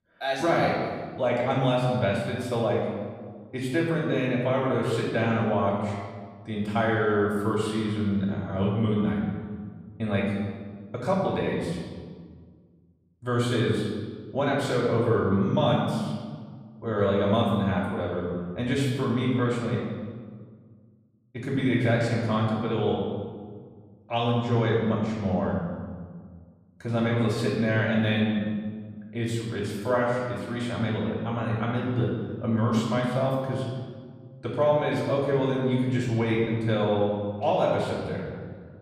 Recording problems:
off-mic speech; far
room echo; noticeable; dies away in 1.5 s

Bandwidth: 14.5 kHz